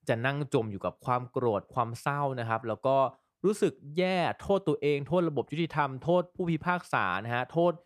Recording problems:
none

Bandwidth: 14 kHz